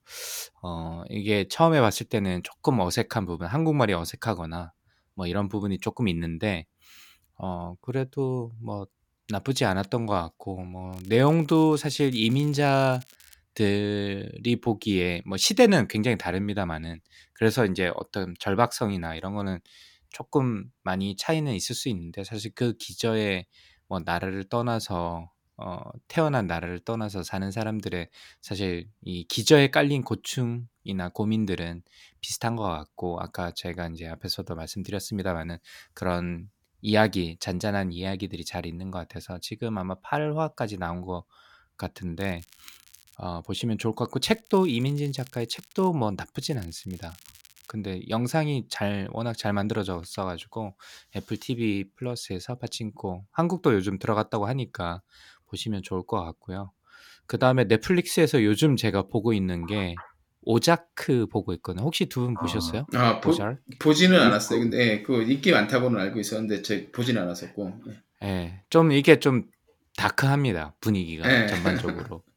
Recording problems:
crackling; faint; 4 times, first at 11 s; 25 dB below the speech

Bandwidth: 18 kHz